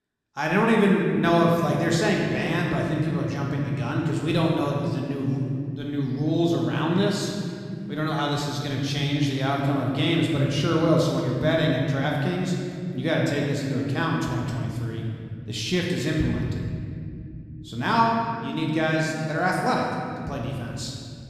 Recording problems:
room echo; noticeable; dies away in 2.3 s
off-mic speech; somewhat distant

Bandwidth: 14.5 kHz